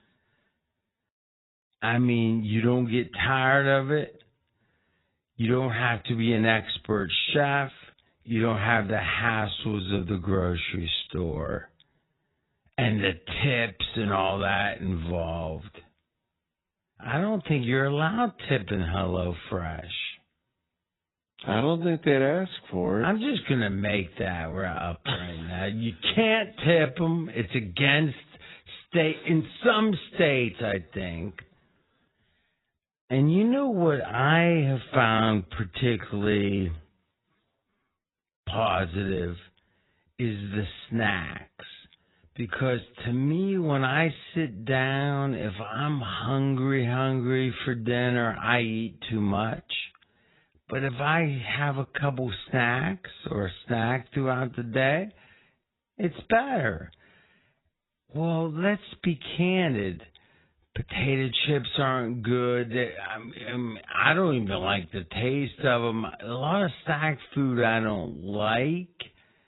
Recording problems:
garbled, watery; badly; nothing above 4 kHz
wrong speed, natural pitch; too slow; 0.6 times normal speed

